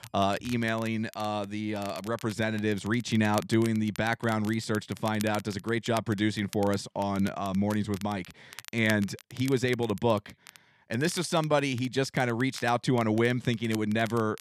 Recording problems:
crackle, like an old record; noticeable; 20 dB below the speech

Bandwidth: 13.5 kHz